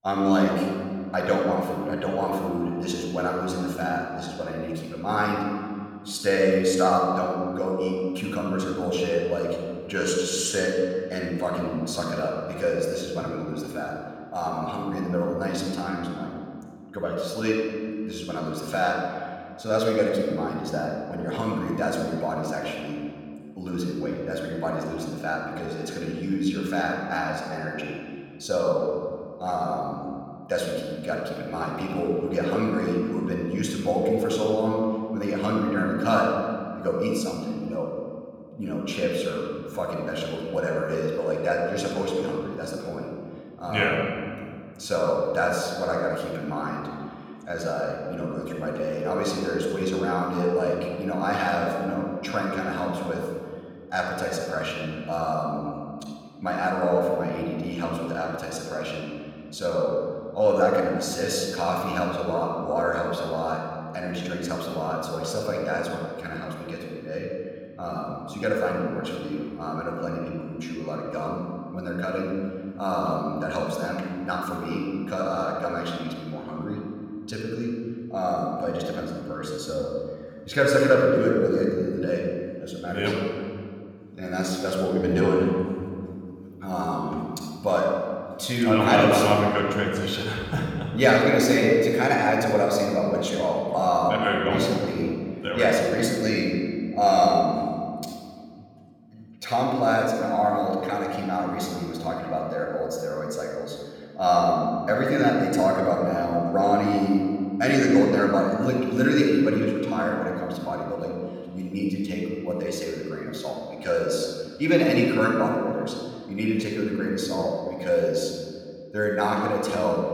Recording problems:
room echo; noticeable; dies away in 2 s
off-mic speech; somewhat distant

